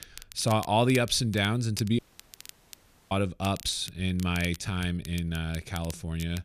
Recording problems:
crackle, like an old record; noticeable; 15 dB below the speech
audio cutting out; at 2 s for 1 s

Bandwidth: 14.5 kHz